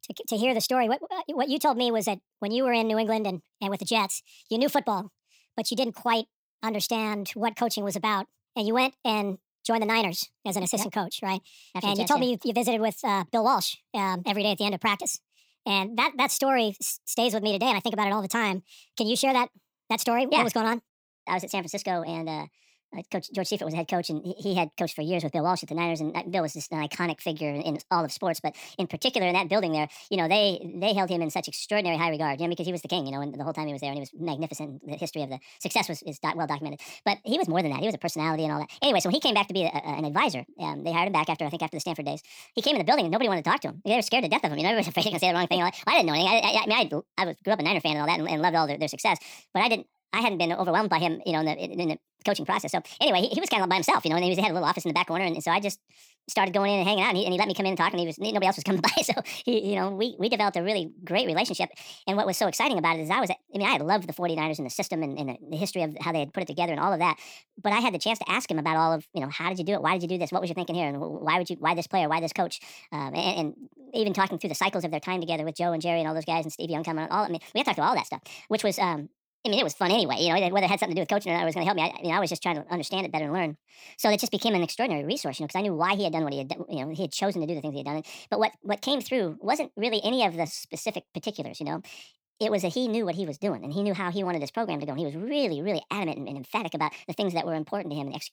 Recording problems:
wrong speed and pitch; too fast and too high; 1.5 times normal speed

